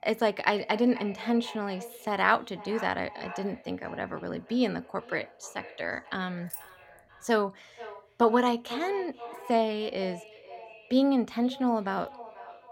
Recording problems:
echo of what is said; noticeable; throughout; 480 ms later, 15 dB below the speech
jangling keys; faint; at 6.5 s; peak 10 dB below the speech

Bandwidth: 16 kHz